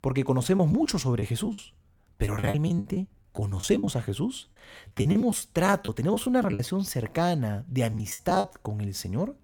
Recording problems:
choppy; very; from 0.5 to 4 s, from 4.5 to 6.5 s and at 8 s; 17% of the speech affected

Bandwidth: 18 kHz